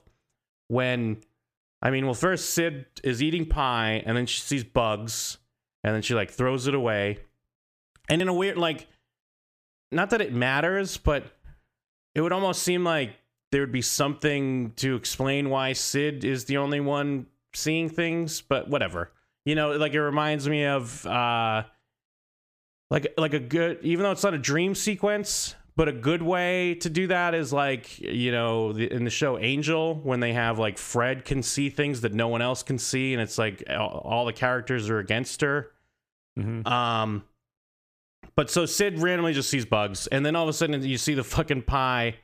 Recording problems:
squashed, flat; somewhat

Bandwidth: 15 kHz